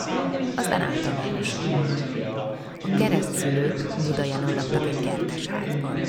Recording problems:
chatter from many people; very loud; throughout; 2 dB above the speech

